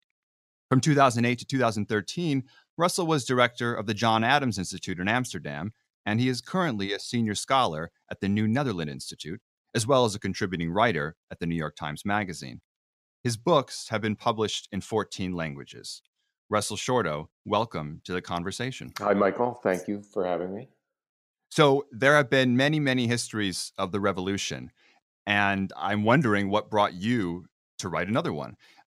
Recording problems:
none

